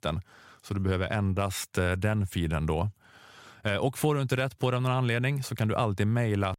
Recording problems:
none

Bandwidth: 16 kHz